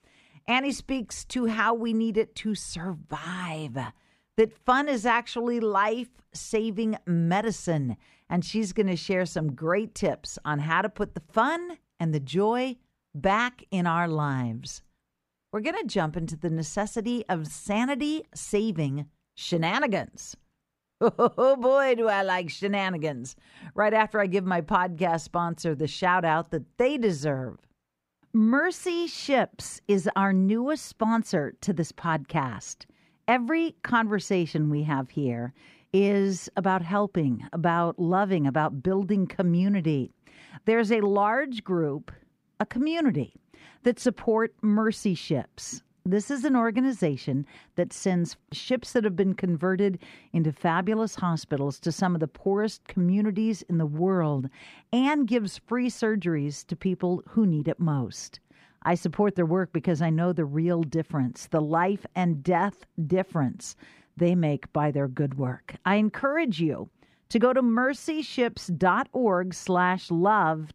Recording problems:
muffled; slightly; fading above 2.5 kHz

